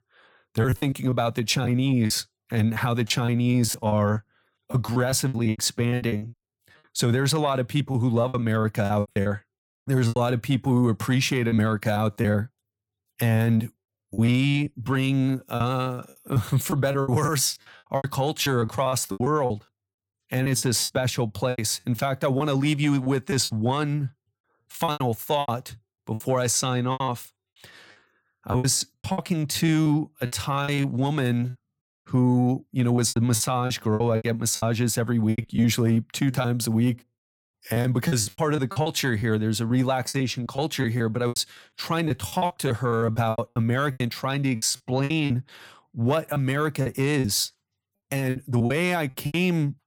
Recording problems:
choppy; very; 14% of the speech affected

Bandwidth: 17.5 kHz